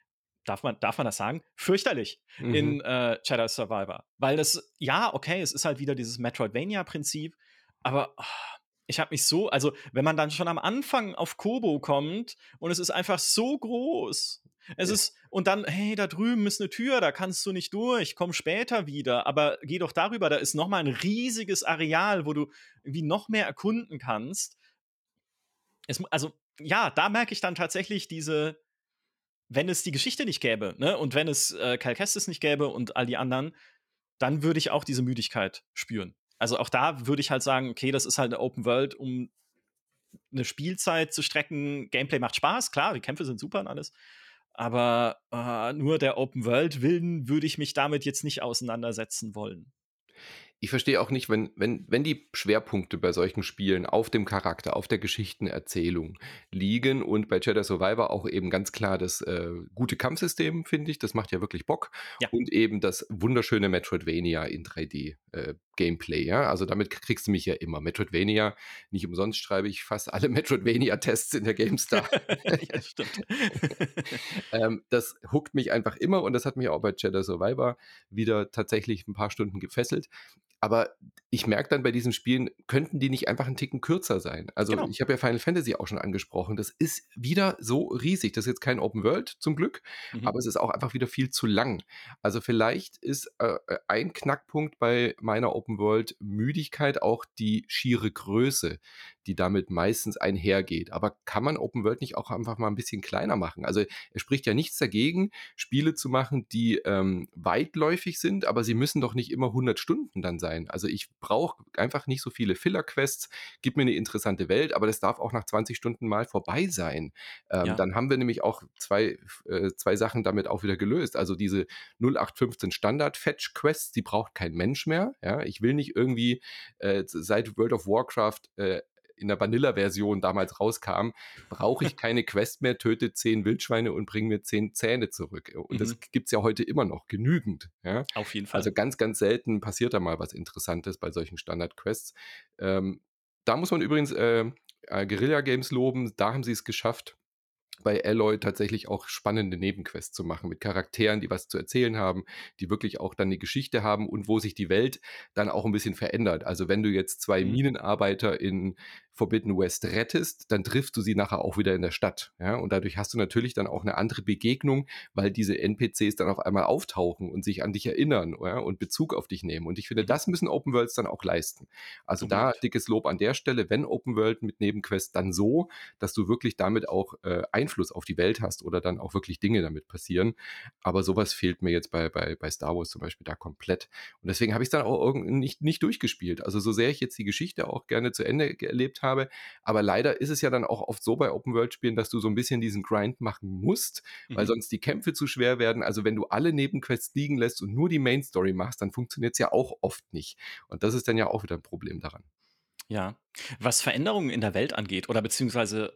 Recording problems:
none

